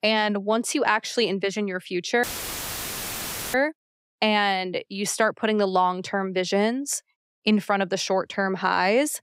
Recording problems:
audio cutting out; filled with static; at 2 s for 1.5 s

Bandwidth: 15.5 kHz